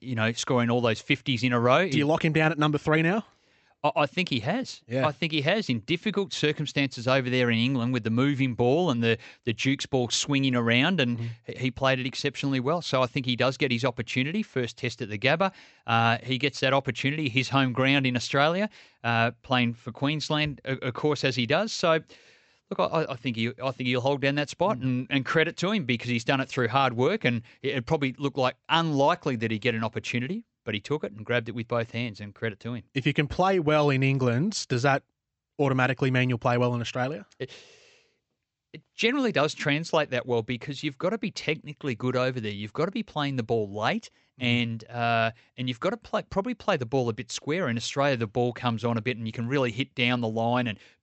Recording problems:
high frequencies cut off; noticeable; nothing above 8 kHz

